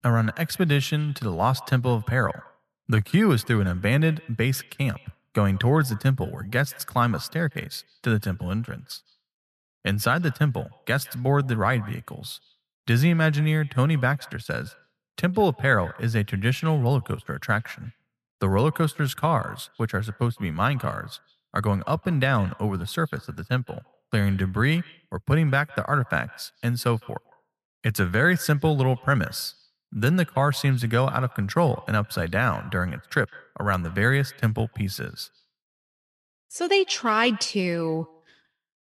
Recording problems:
echo of what is said; faint; throughout; 160 ms later, 25 dB below the speech

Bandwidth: 14 kHz